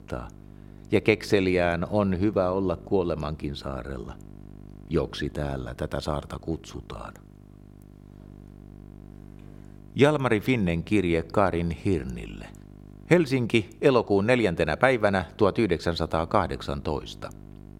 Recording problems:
electrical hum; faint; throughout; 50 Hz, 30 dB below the speech

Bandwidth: 16 kHz